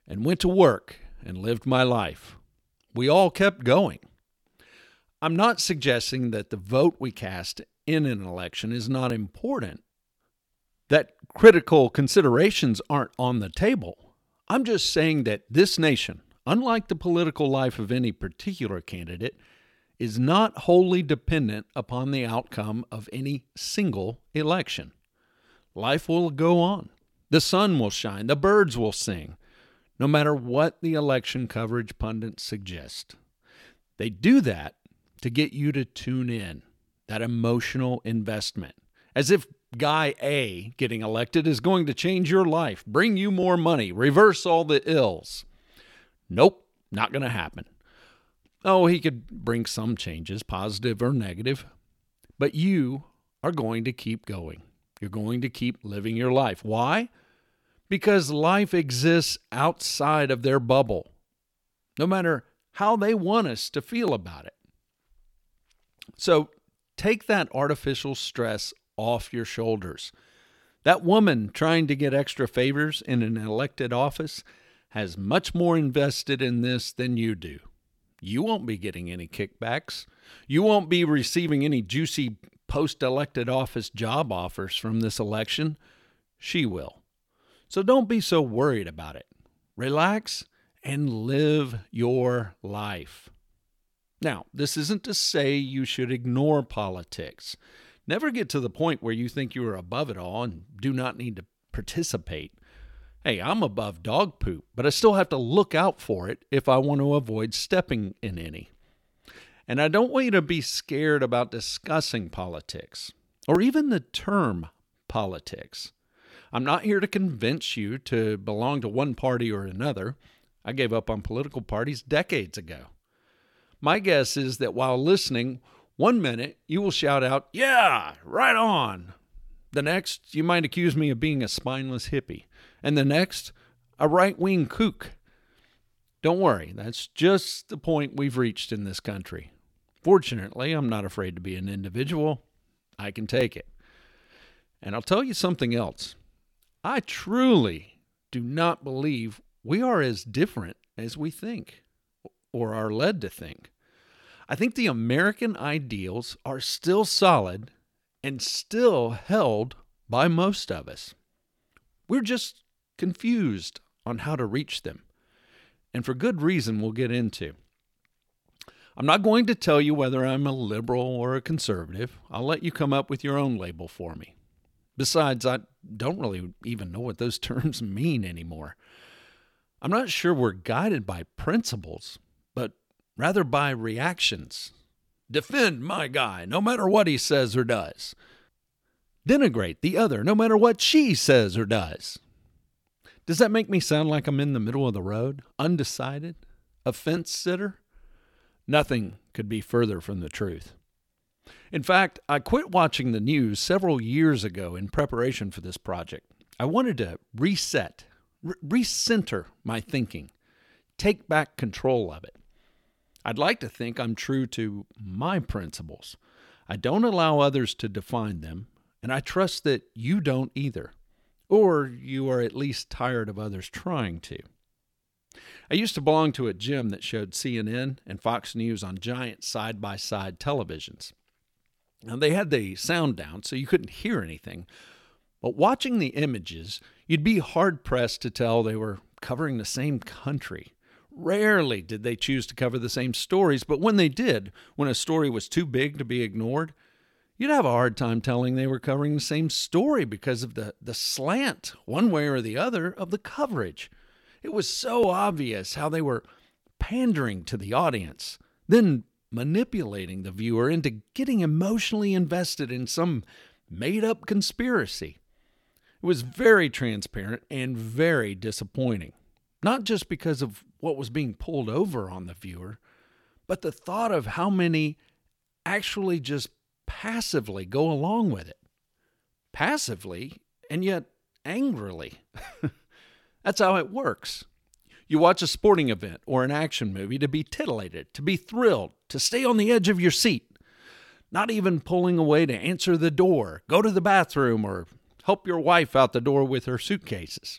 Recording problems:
none

